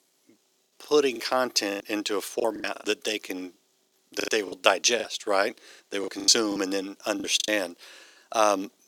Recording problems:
thin; very; fading below 350 Hz
choppy; very; 12% of the speech affected

